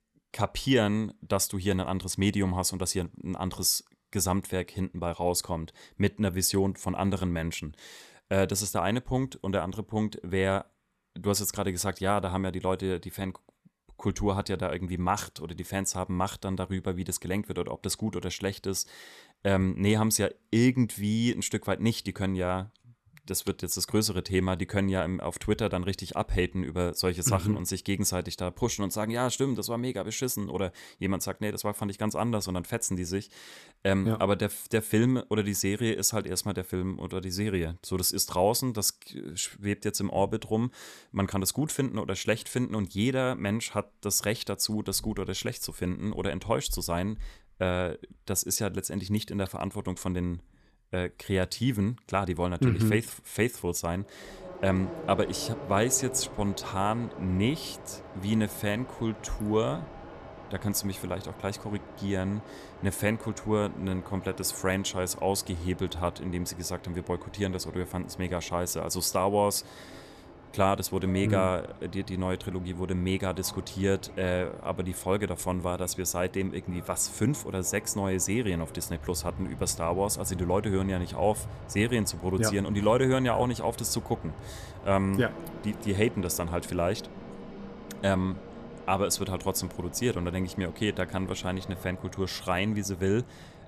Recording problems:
train or aircraft noise; noticeable; from 54 s on; 15 dB below the speech

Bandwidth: 14 kHz